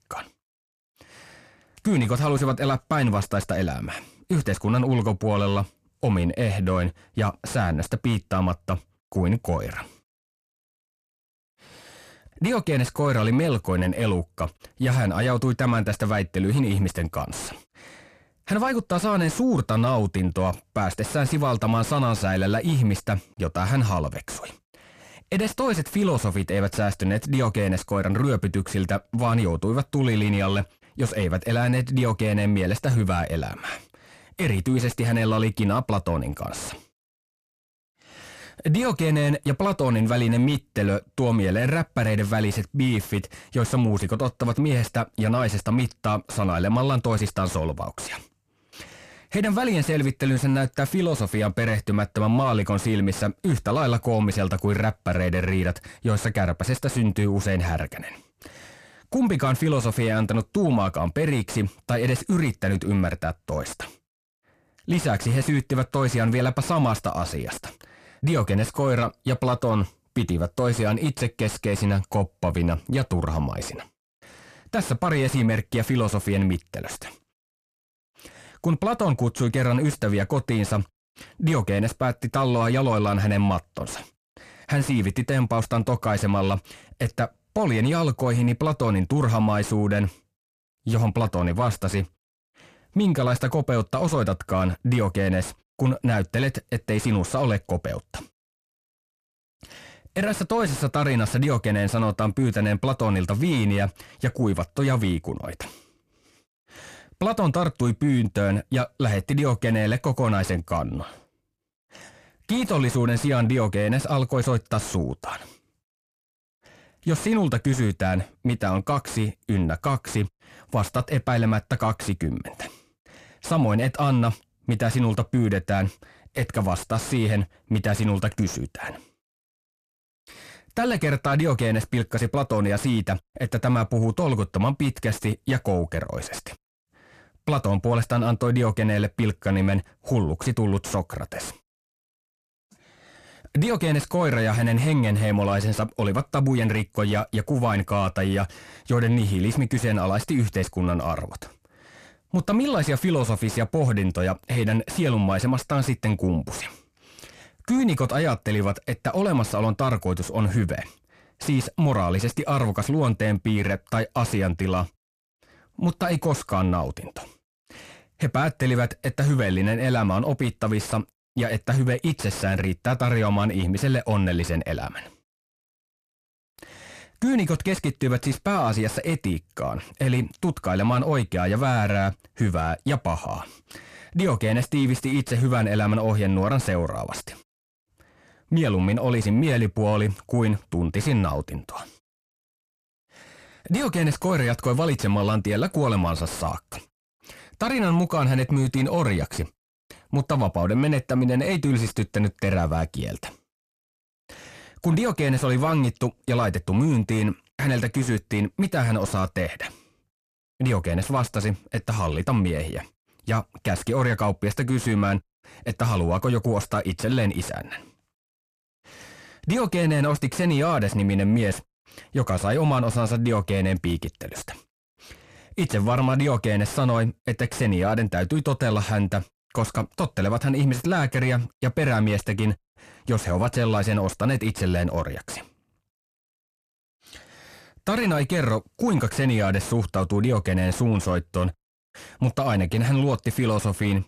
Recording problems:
distortion; slight; 10 dB below the speech

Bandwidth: 14.5 kHz